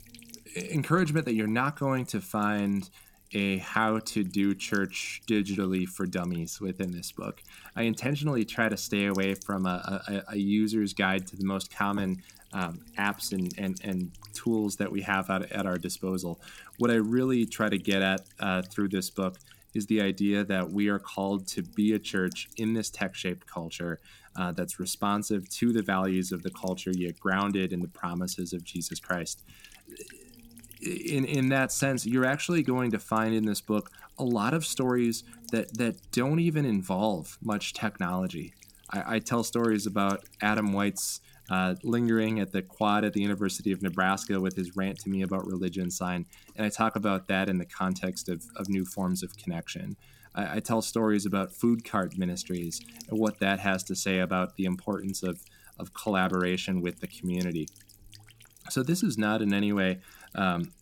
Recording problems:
electrical hum; faint; throughout; 60 Hz, 25 dB below the speech

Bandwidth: 17 kHz